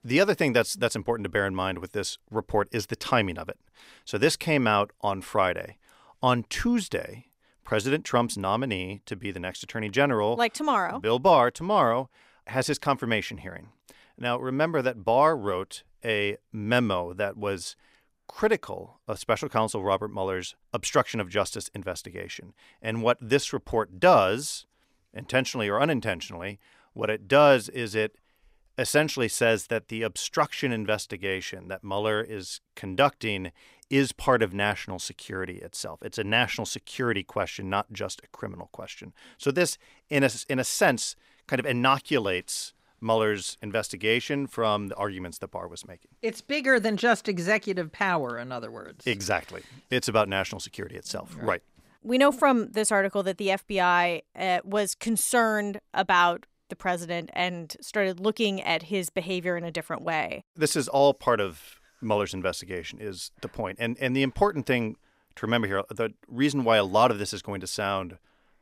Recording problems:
none

